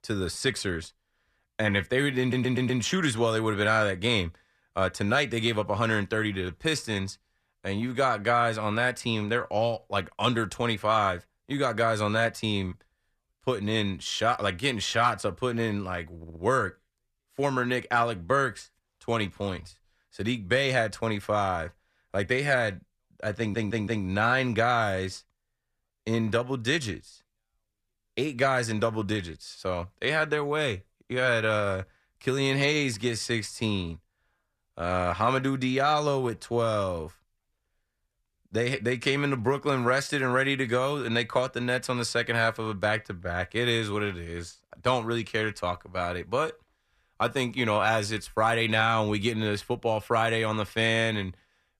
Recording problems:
audio stuttering; at 2 s, at 16 s and at 23 s

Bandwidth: 14.5 kHz